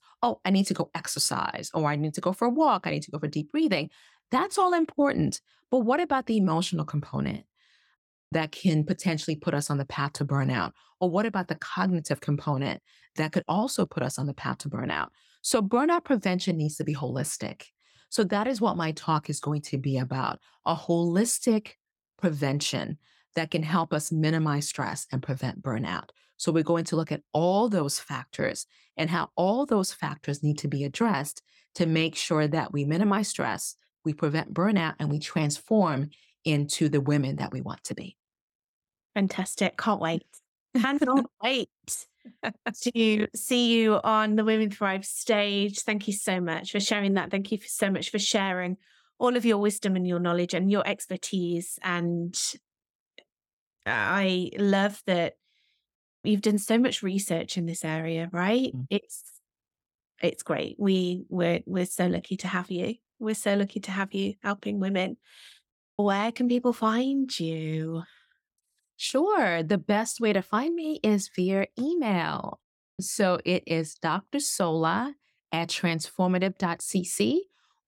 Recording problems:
none

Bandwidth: 17 kHz